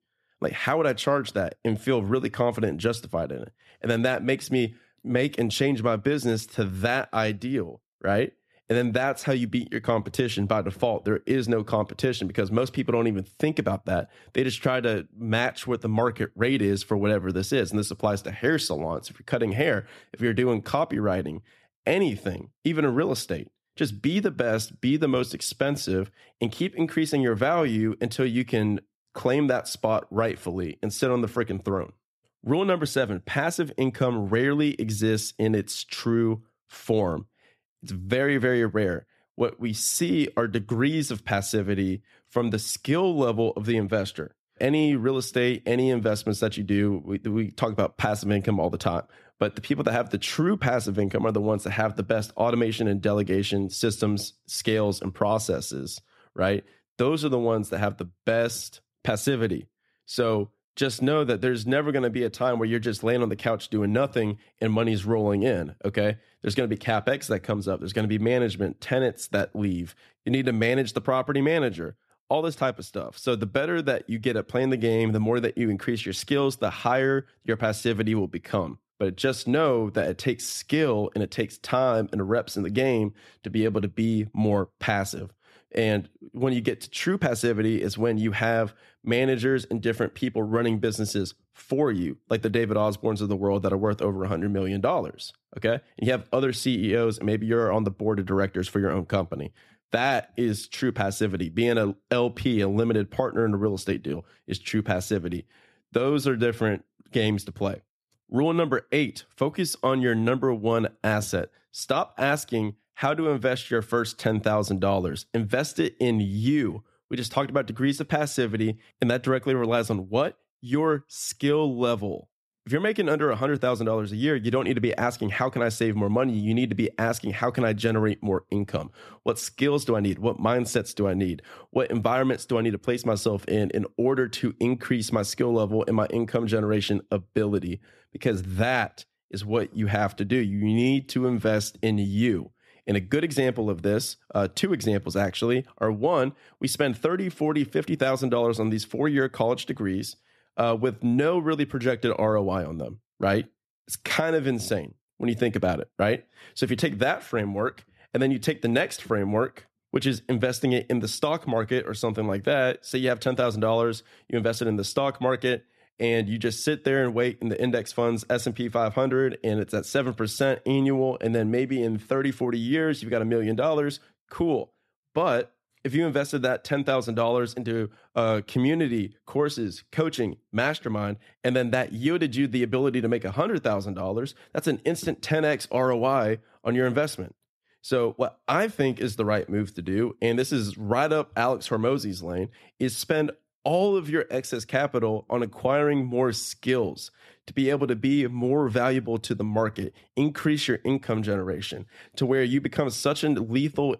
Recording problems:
none

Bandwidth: 13.5 kHz